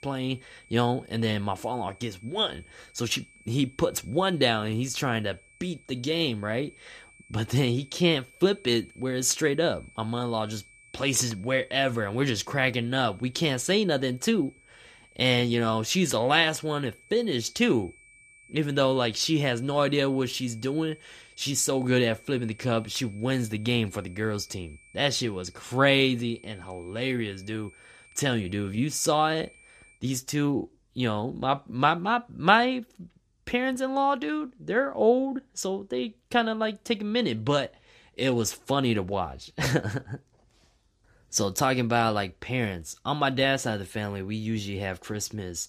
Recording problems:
high-pitched whine; faint; until 30 s; 2.5 kHz, 25 dB below the speech

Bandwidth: 14.5 kHz